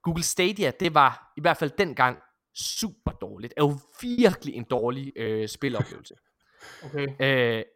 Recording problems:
choppy; very; at 2.5 s and from 4 to 5.5 s; 8% of the speech affected

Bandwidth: 16.5 kHz